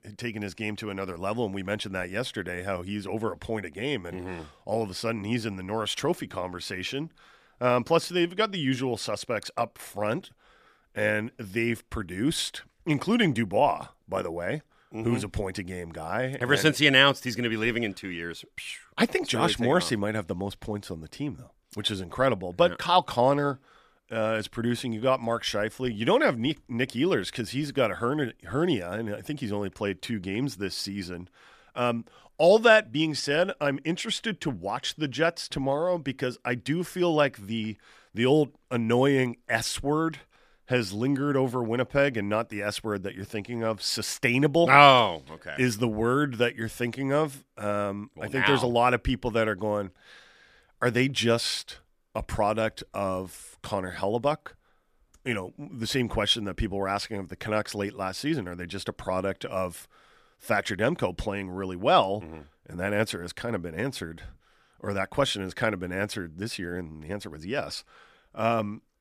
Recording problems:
none

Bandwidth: 14.5 kHz